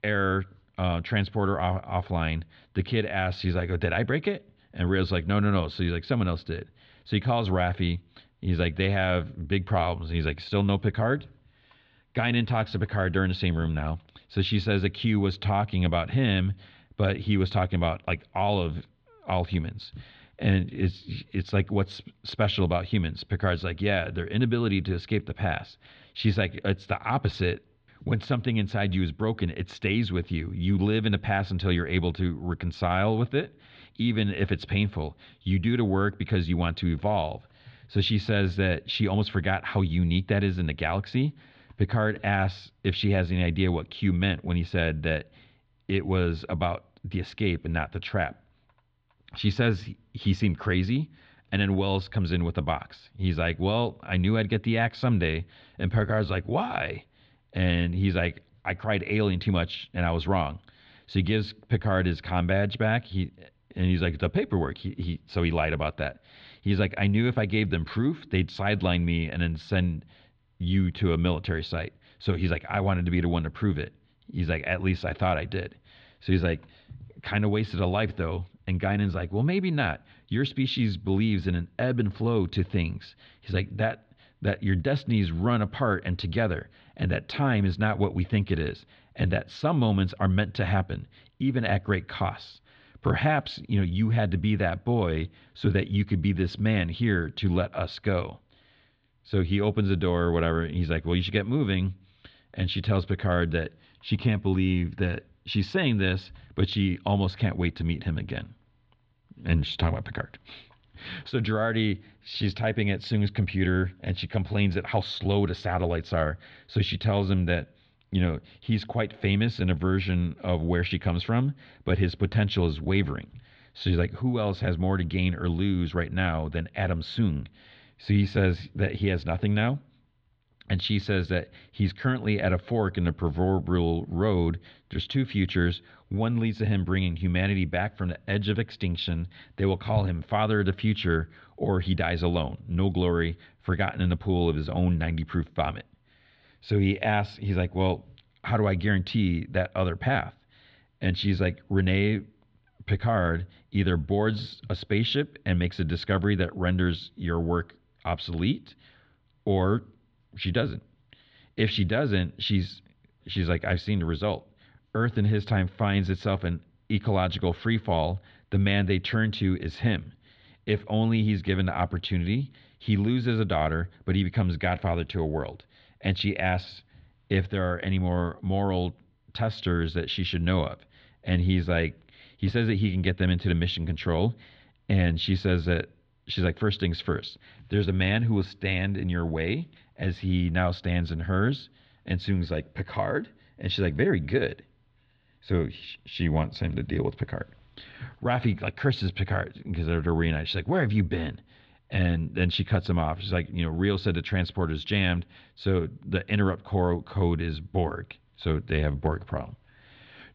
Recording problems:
muffled; slightly; fading above 4 kHz

